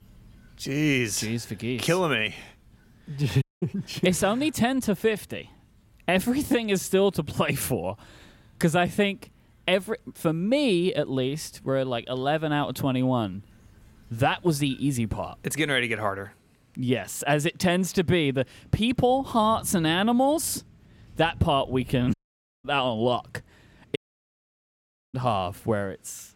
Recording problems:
rain or running water; faint; throughout; 25 dB below the speech
audio cutting out; at 3.5 s, at 22 s for 0.5 s and at 24 s for 1 s

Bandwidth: 16.5 kHz